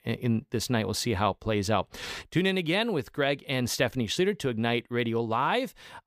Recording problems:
none

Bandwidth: 15 kHz